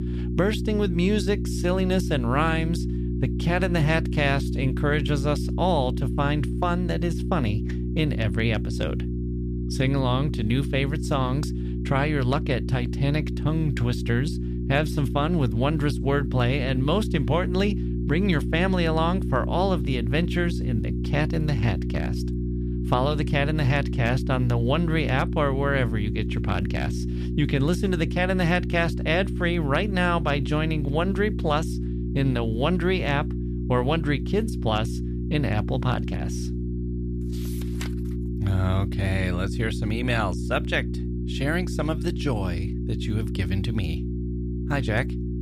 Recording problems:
electrical hum; loud; throughout; 60 Hz, 10 dB below the speech

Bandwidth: 14.5 kHz